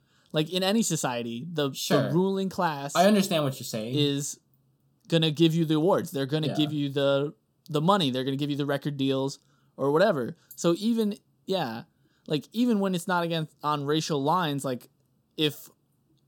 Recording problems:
none

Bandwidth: 18 kHz